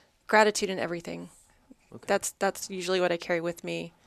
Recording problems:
none

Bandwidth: 13.5 kHz